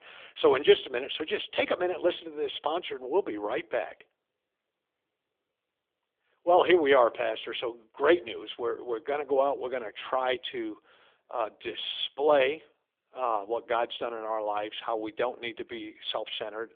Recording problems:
phone-call audio; nothing above 3.5 kHz

